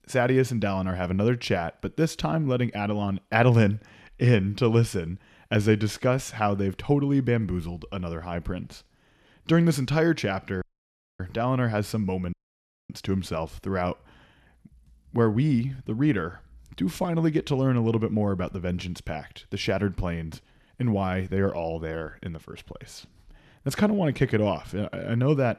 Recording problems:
audio cutting out; at 11 s for 0.5 s and at 12 s for 0.5 s

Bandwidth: 13.5 kHz